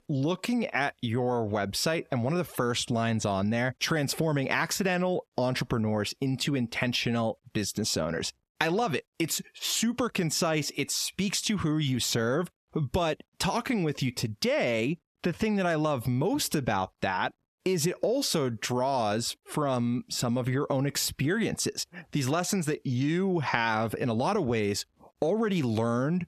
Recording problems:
squashed, flat; heavily

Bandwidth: 14 kHz